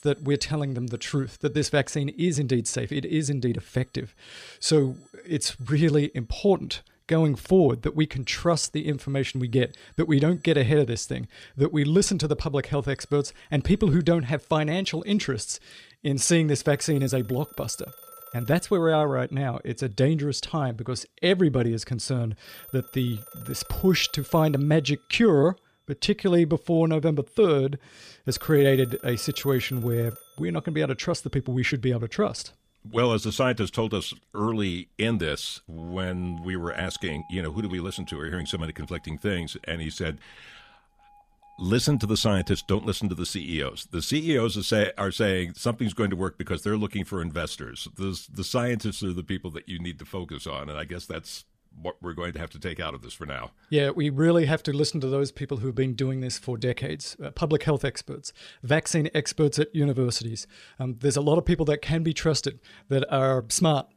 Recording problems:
alarms or sirens; faint; throughout; 20 dB below the speech

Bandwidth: 14.5 kHz